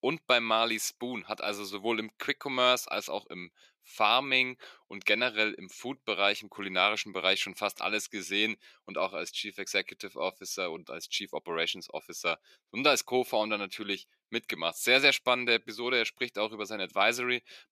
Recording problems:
thin; somewhat; fading below 350 Hz

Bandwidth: 14.5 kHz